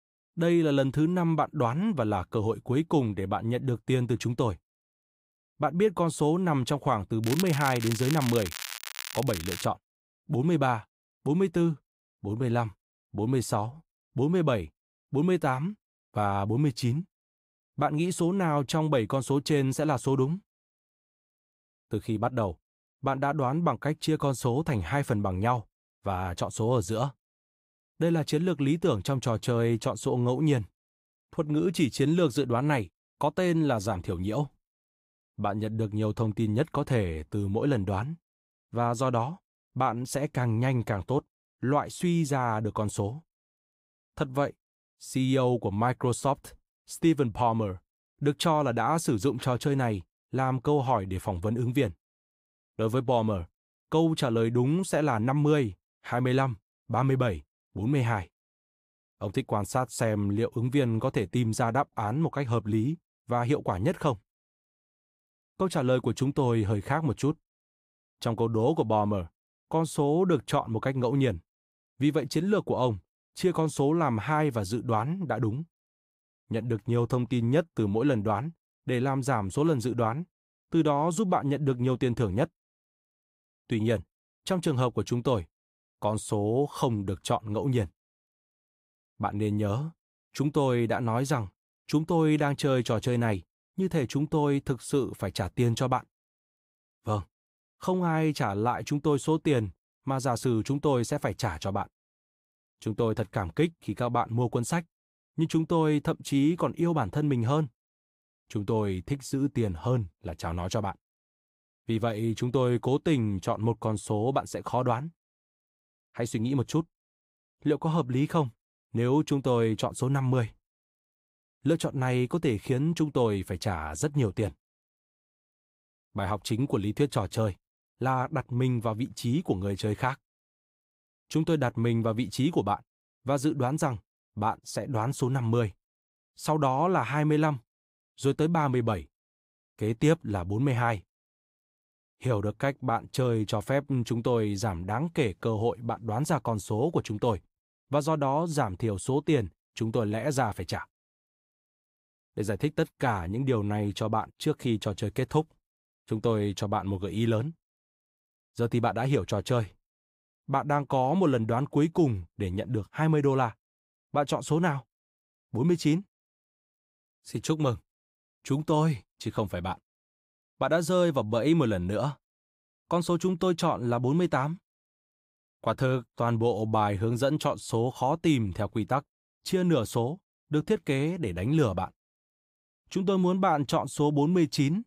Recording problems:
crackling; loud; from 7 to 9.5 s; 8 dB below the speech

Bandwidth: 15.5 kHz